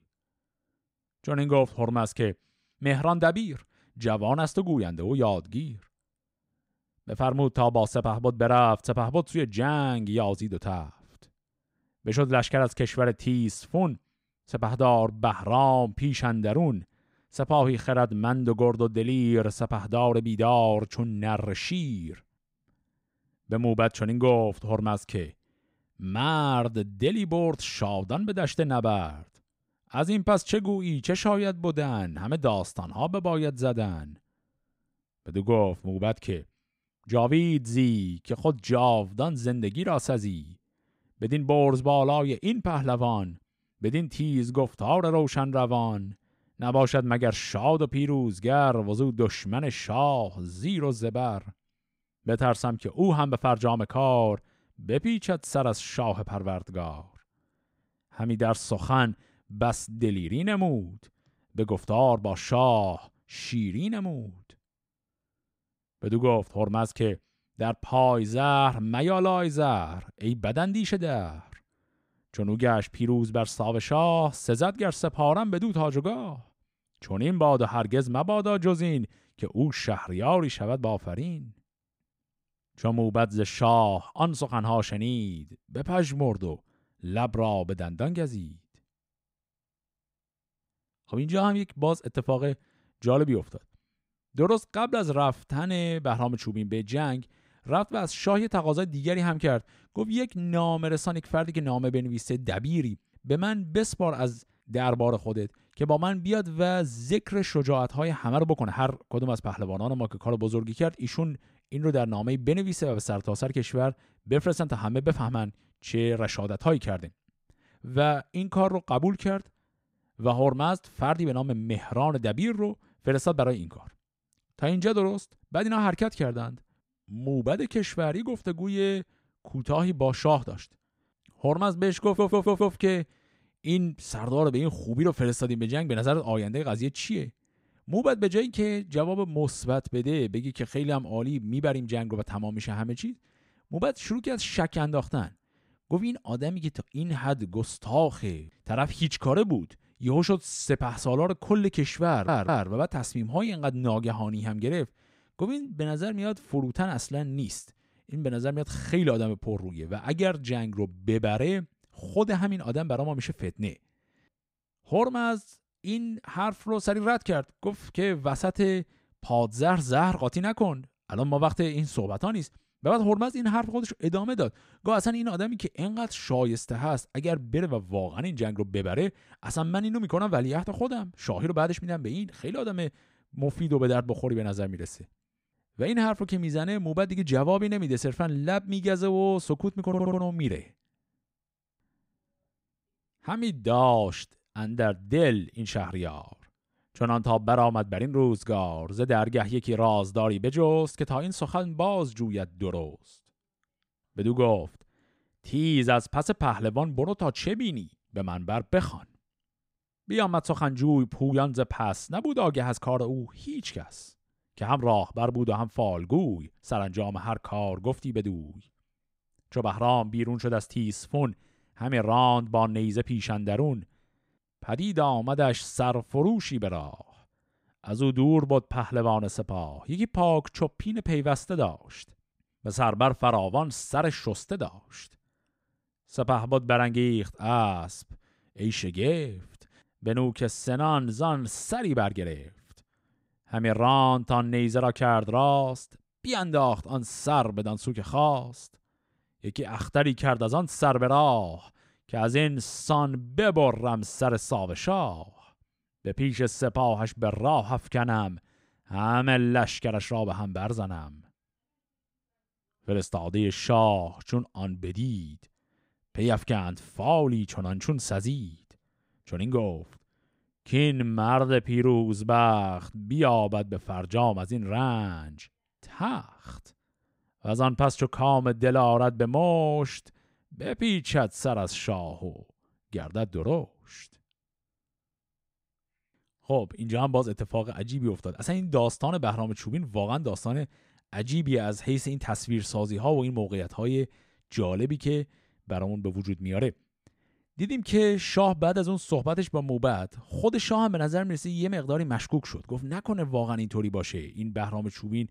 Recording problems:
audio stuttering; at 2:12, at 2:32 and at 3:10

